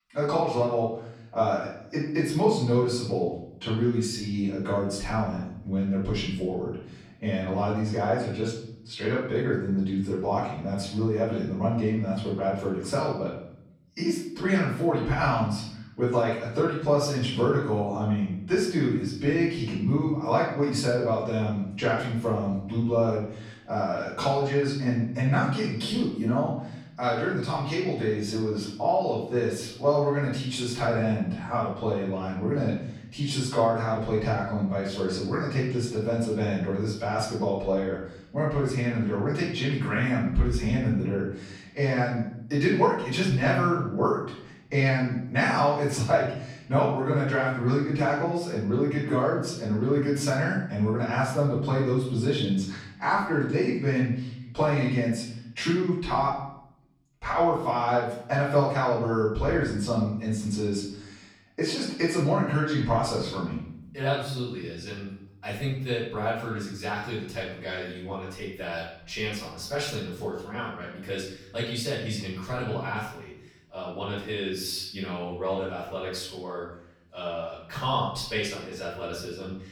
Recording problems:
off-mic speech; far
room echo; noticeable; dies away in 0.8 s

